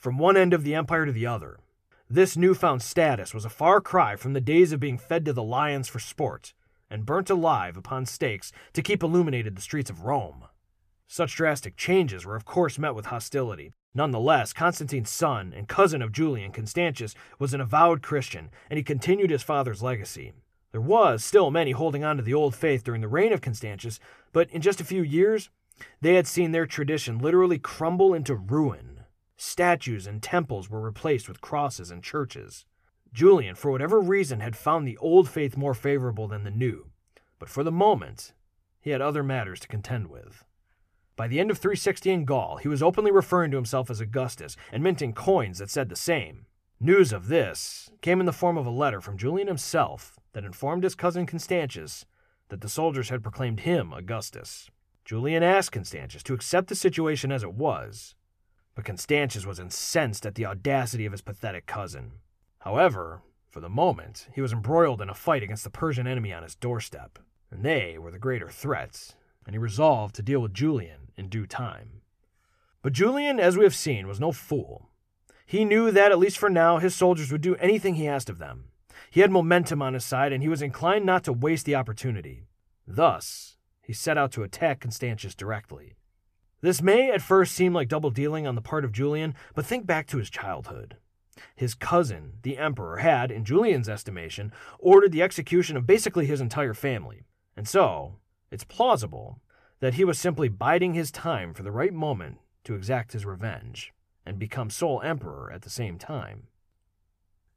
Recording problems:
none

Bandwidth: 14.5 kHz